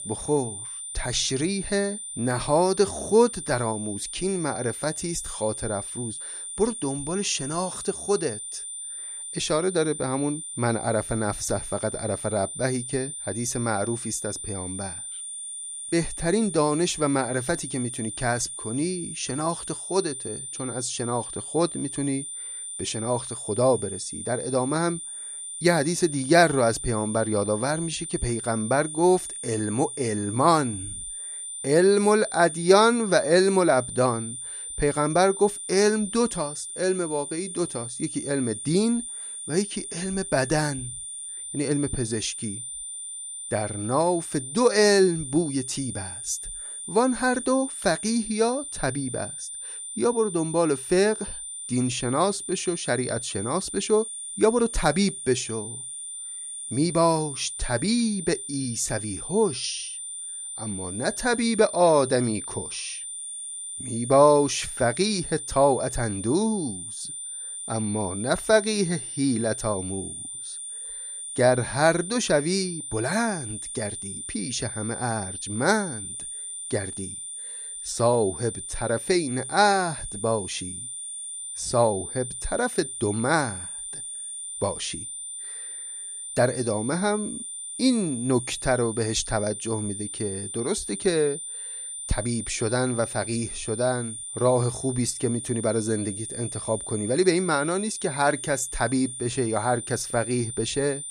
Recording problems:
high-pitched whine; loud; throughout; 9 kHz, 7 dB below the speech

